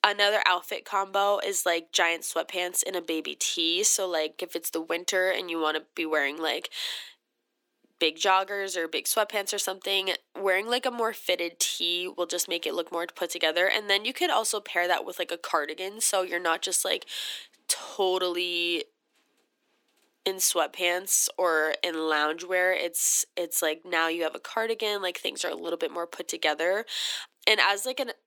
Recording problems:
thin; very; fading below 300 Hz

